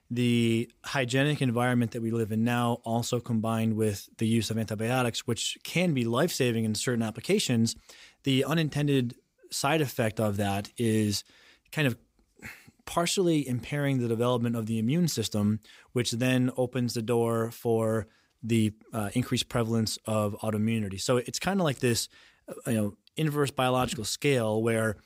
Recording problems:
none

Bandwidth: 15.5 kHz